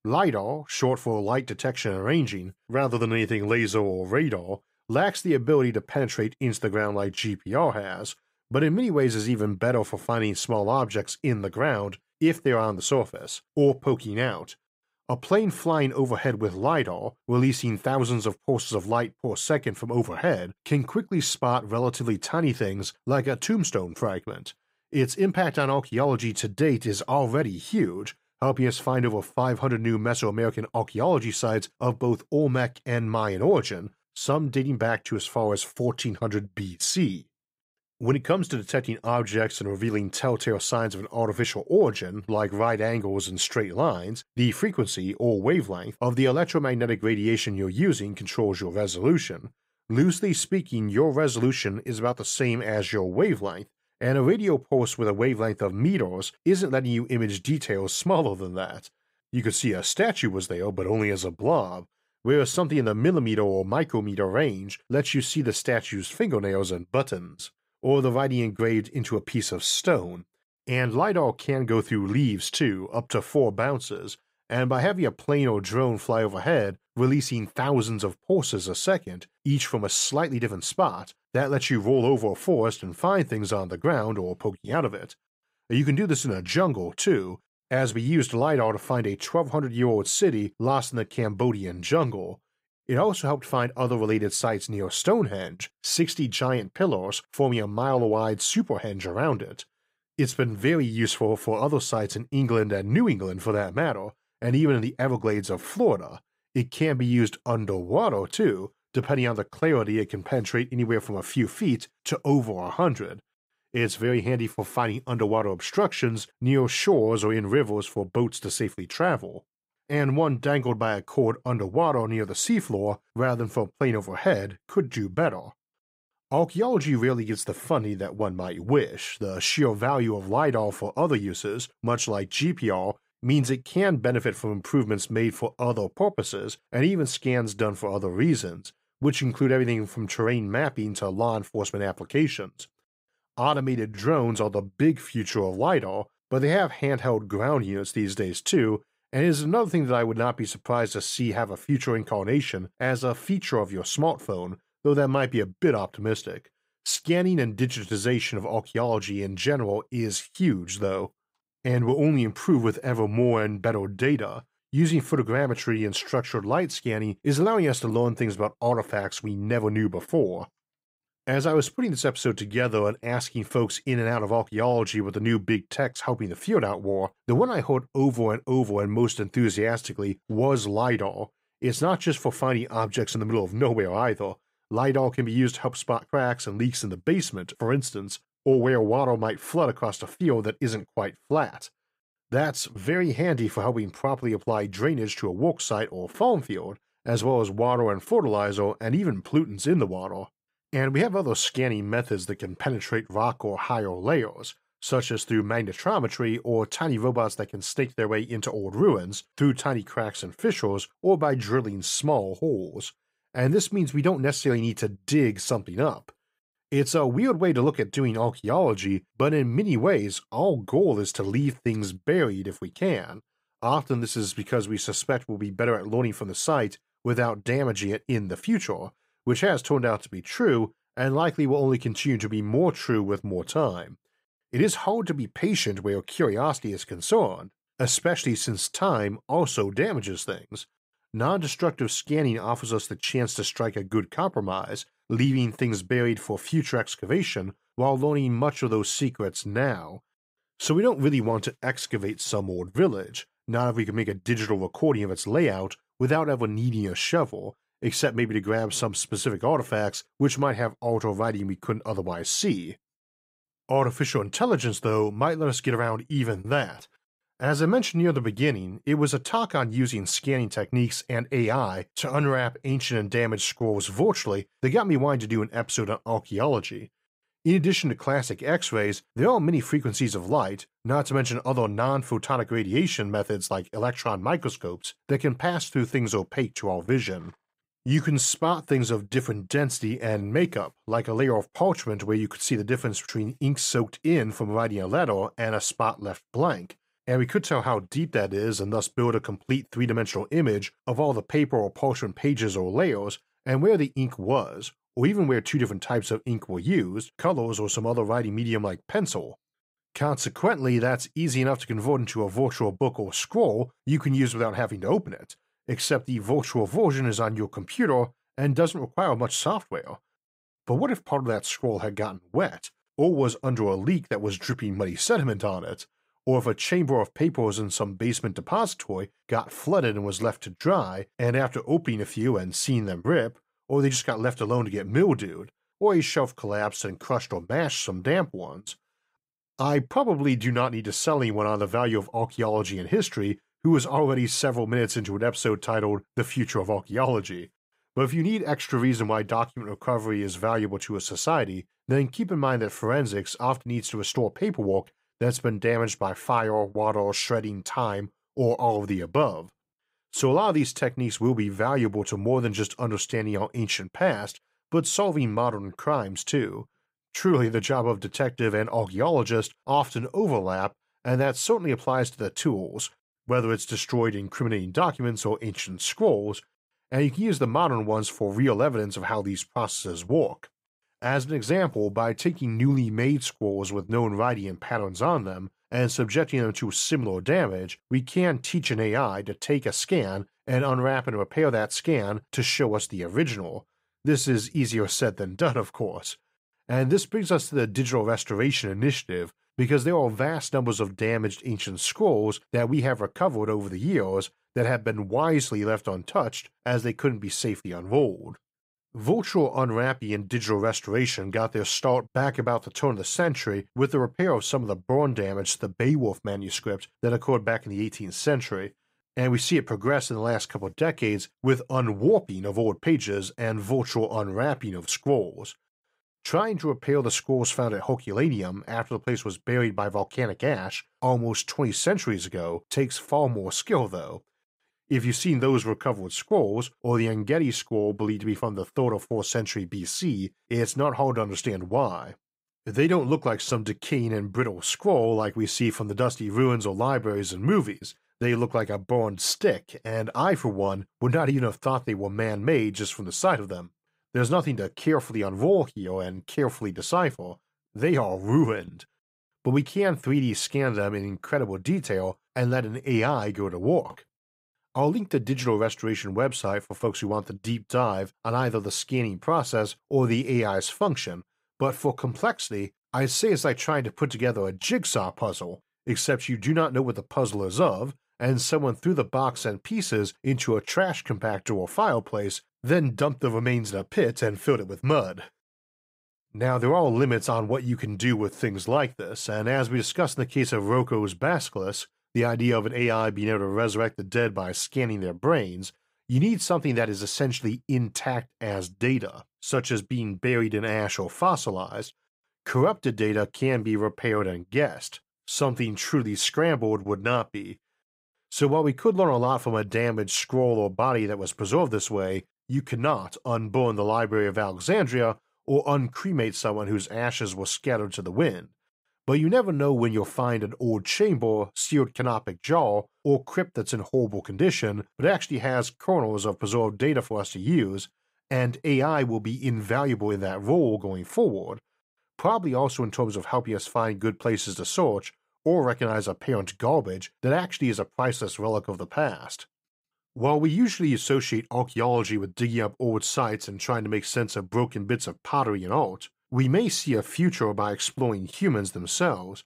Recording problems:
none

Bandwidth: 15.5 kHz